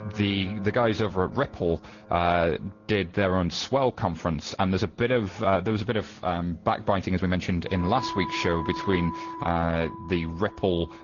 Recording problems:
high frequencies cut off; noticeable; nothing above 7 kHz
garbled, watery; slightly
background music; noticeable; throughout; 10 dB below the speech
uneven, jittery; strongly; from 1.5 to 10 s

